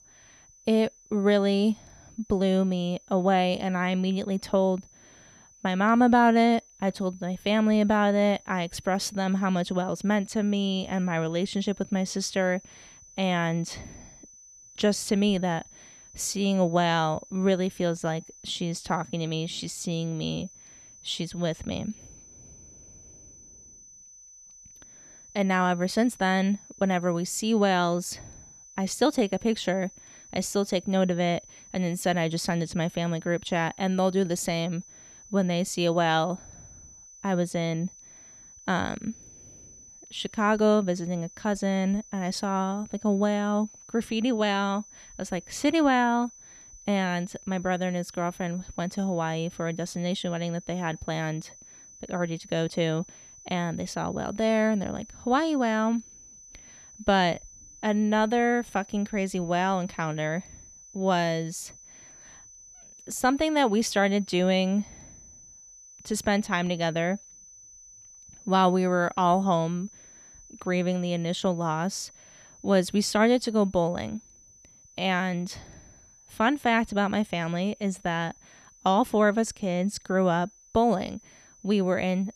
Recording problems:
high-pitched whine; faint; throughout; 6 kHz, 20 dB below the speech

